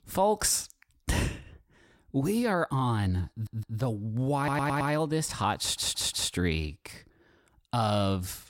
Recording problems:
audio stuttering; at 3.5 s, at 4.5 s and at 5.5 s

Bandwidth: 16 kHz